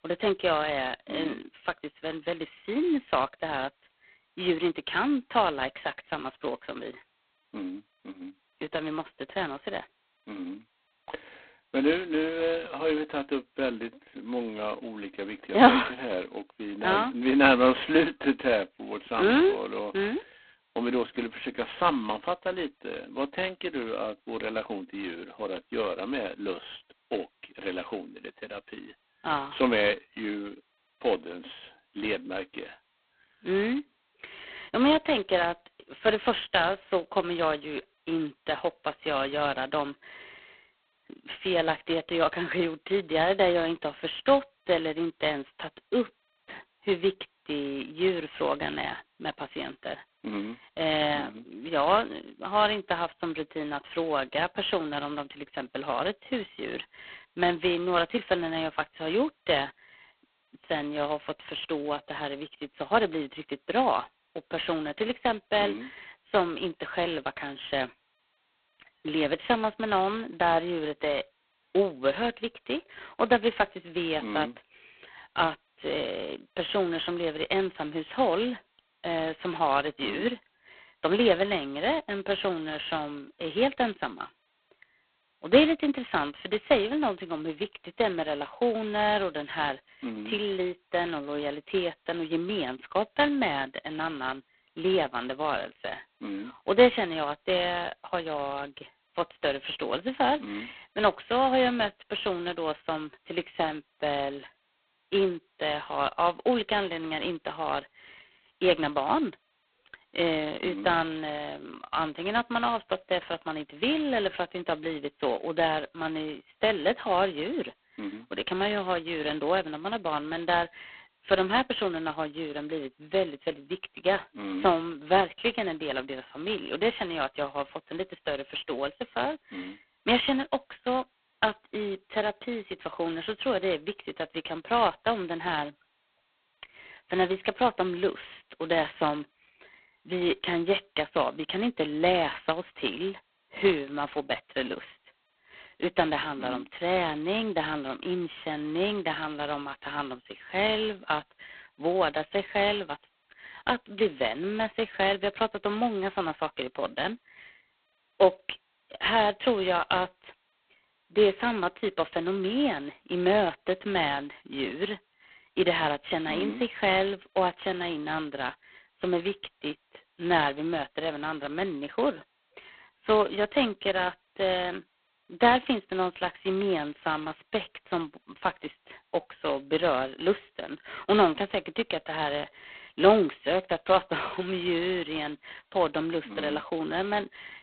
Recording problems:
phone-call audio; poor line; nothing above 3.5 kHz

